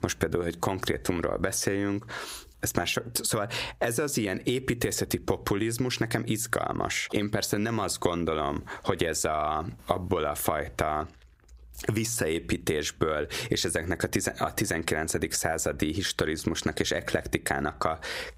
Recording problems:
squashed, flat; heavily

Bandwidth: 15.5 kHz